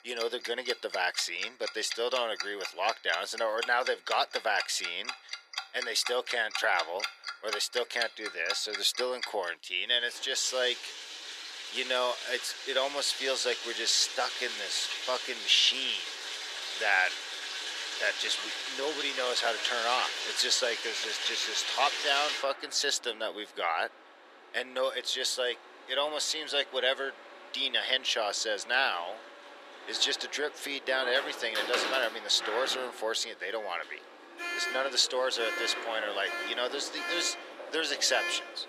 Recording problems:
thin; very; fading below 400 Hz
household noises; loud; throughout; 6 dB below the speech

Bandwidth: 14.5 kHz